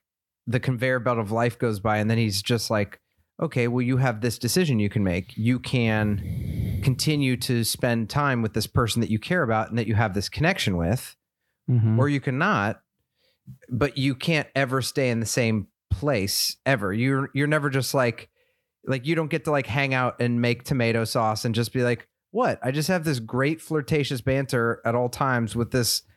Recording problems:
none

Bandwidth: 18 kHz